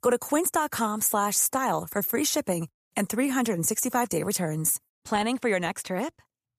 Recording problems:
none

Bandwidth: 14.5 kHz